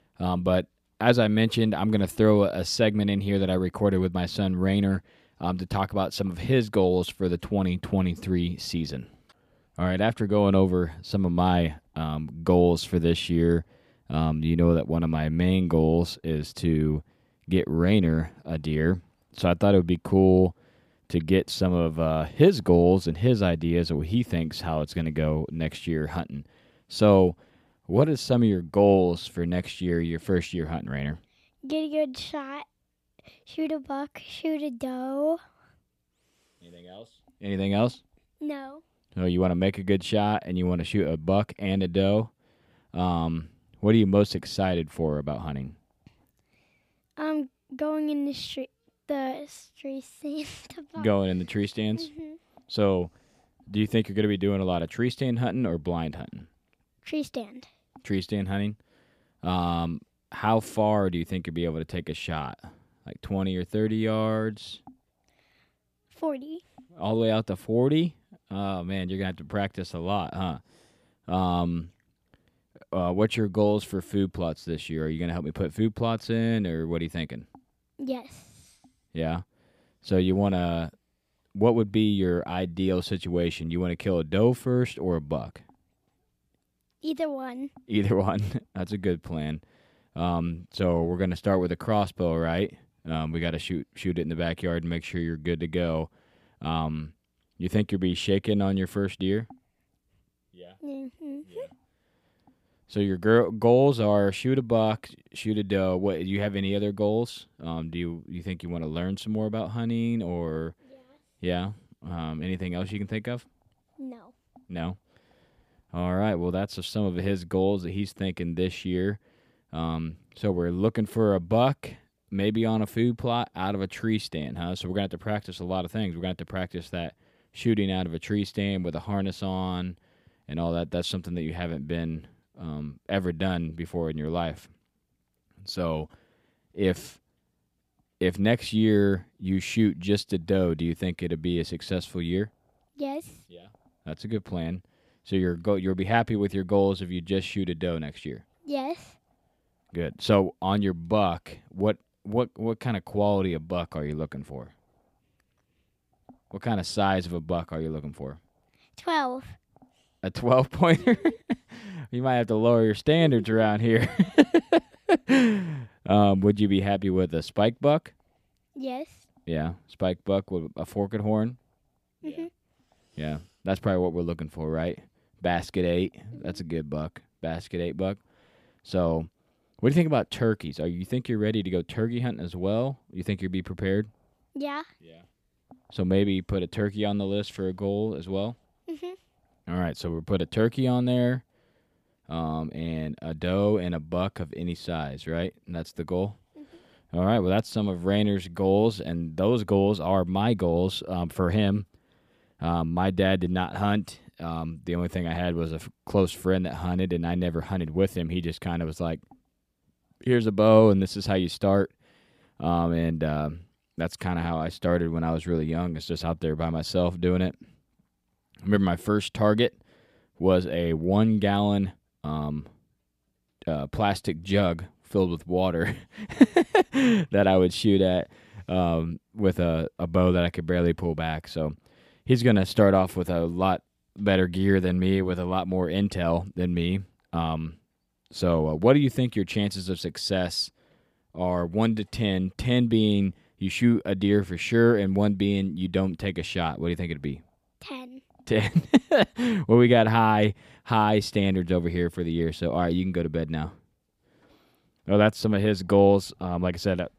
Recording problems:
none

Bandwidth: 15 kHz